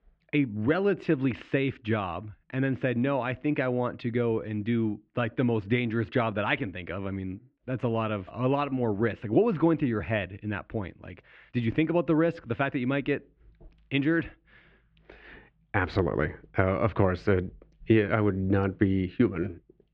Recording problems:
muffled; very; fading above 3 kHz

